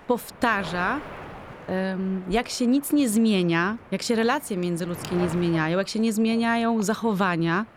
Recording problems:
wind noise on the microphone; occasional gusts; 15 dB below the speech

